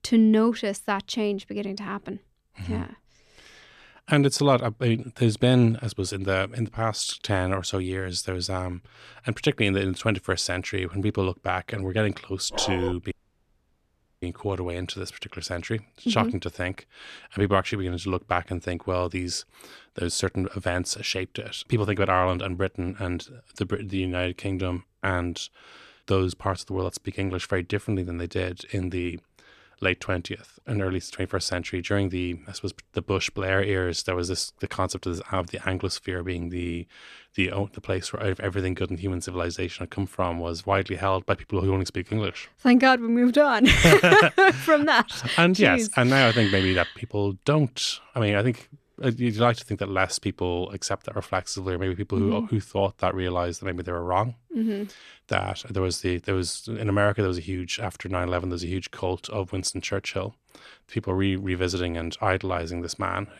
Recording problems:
dog barking; noticeable; at 13 s; peak 6 dB below the speech
audio cutting out; at 13 s for 1 s

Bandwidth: 14.5 kHz